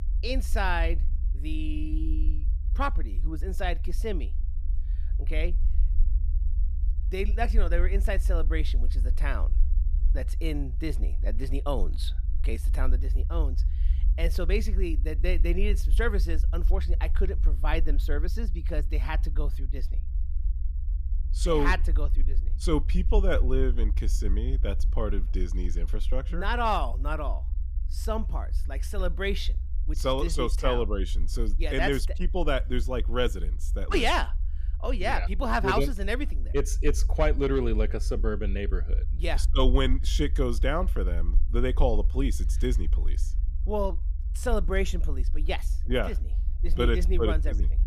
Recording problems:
low rumble; faint; throughout; 20 dB below the speech

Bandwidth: 14.5 kHz